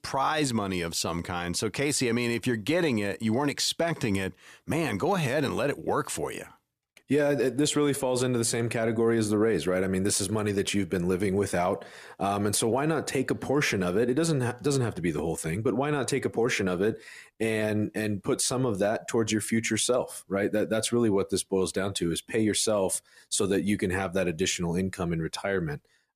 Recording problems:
none

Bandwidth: 14.5 kHz